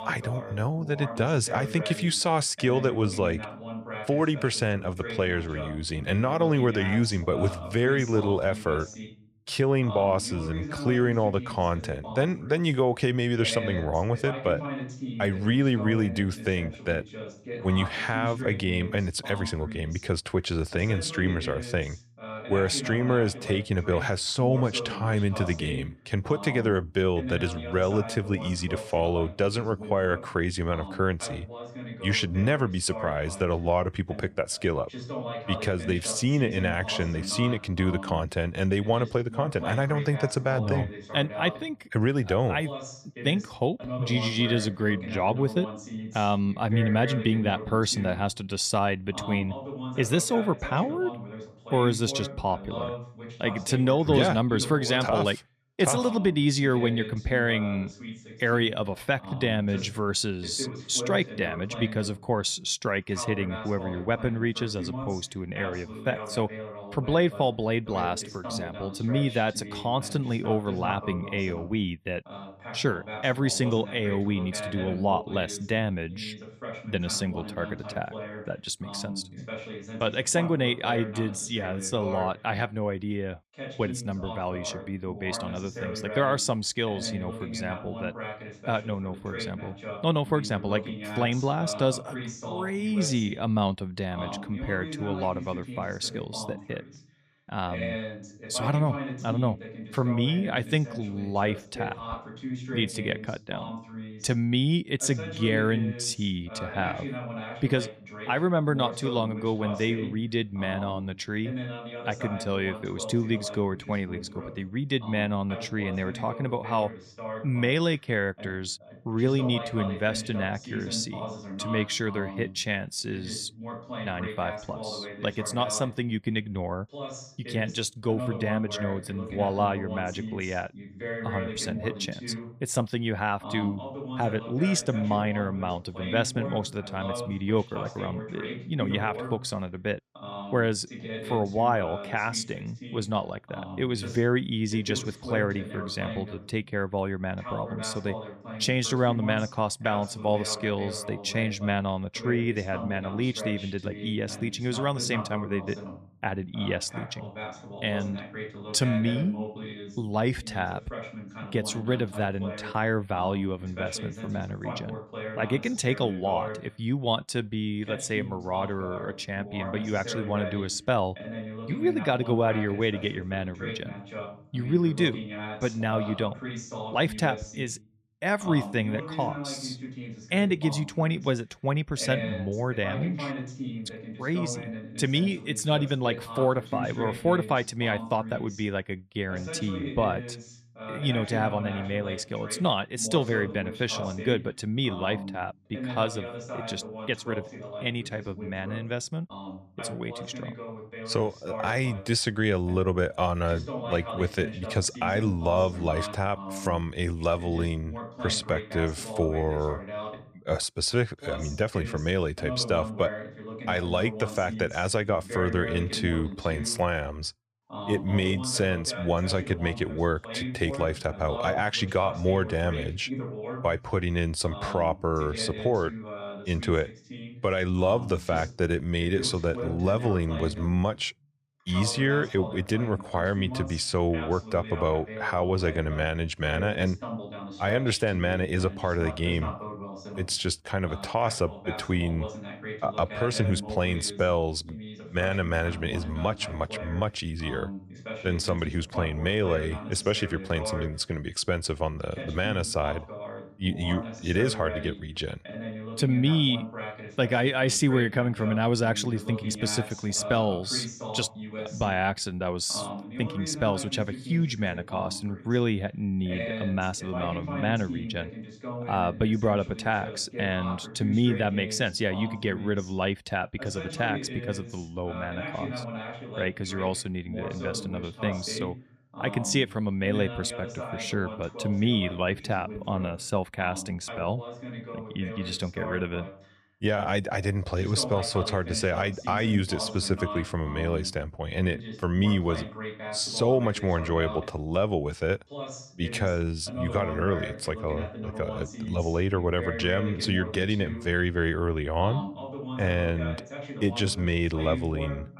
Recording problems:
voice in the background; loud; throughout; 10 dB below the speech

